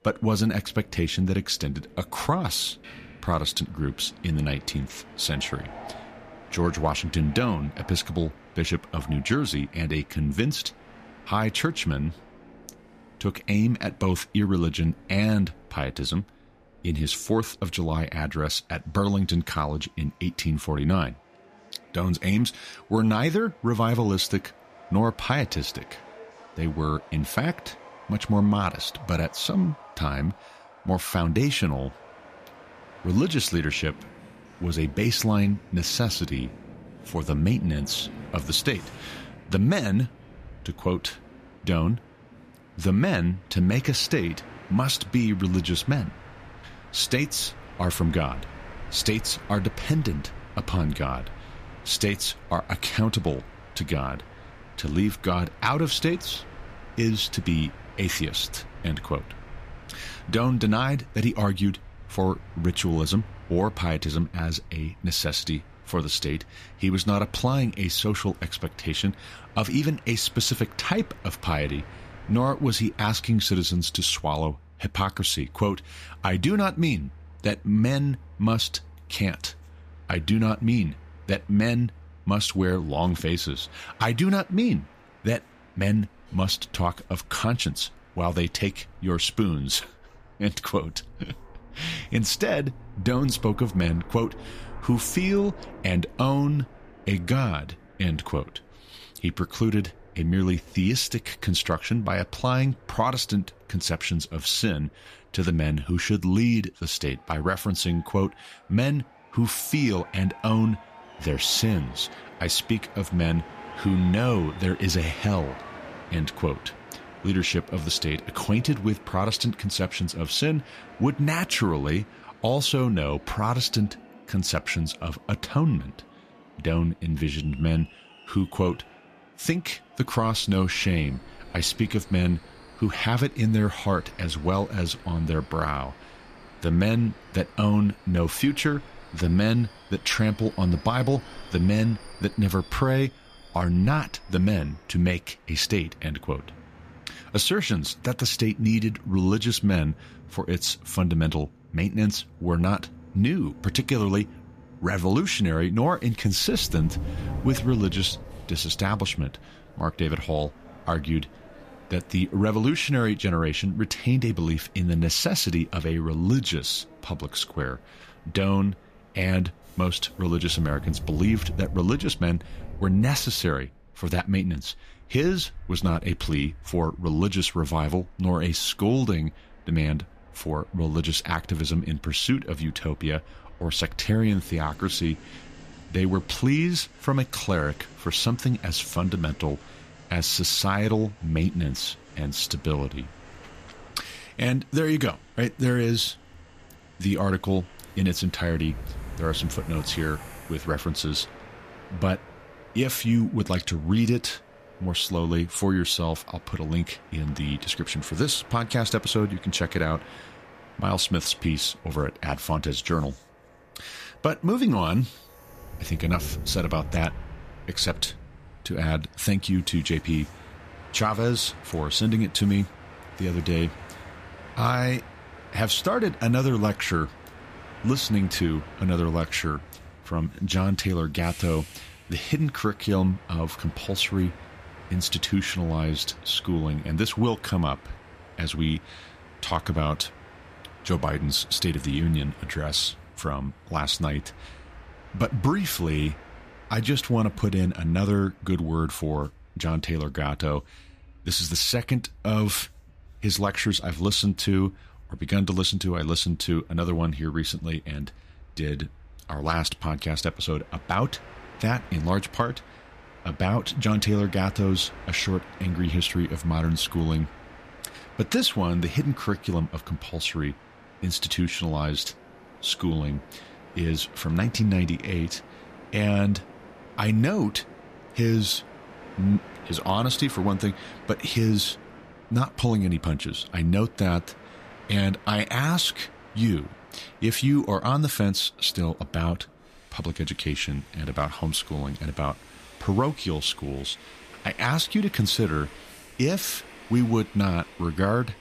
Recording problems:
train or aircraft noise; noticeable; throughout; 20 dB below the speech

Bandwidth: 14.5 kHz